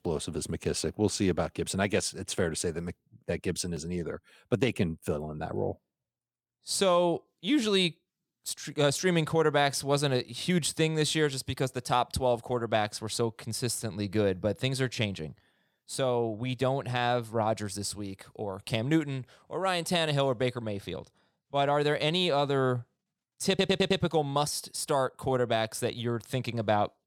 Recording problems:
audio stuttering; at 23 s

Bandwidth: 17.5 kHz